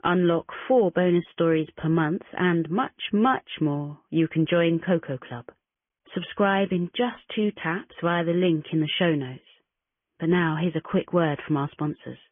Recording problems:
high frequencies cut off; severe; nothing above 3.5 kHz
garbled, watery; slightly

